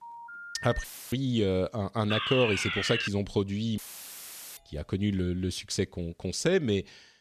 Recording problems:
phone ringing; faint; at the start; peak 10 dB below the speech
audio cutting out; filled with static; at 1 s and at 4 s for 1 s
alarm; loud; at 2 s; peak 1 dB above the speech
doorbell; very faint; at 4.5 s; peak 35 dB below the speech

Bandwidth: 14 kHz